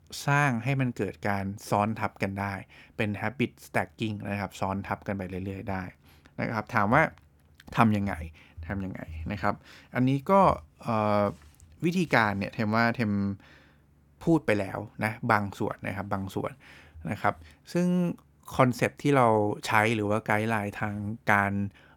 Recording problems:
none

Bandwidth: 18.5 kHz